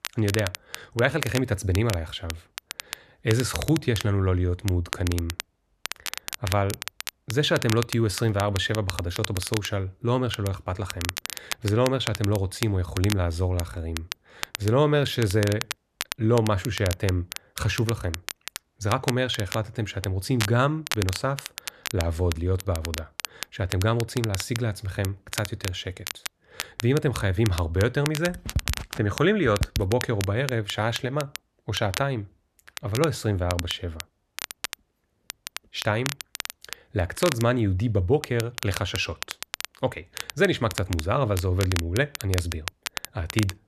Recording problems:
crackle, like an old record; loud; 9 dB below the speech

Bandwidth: 13.5 kHz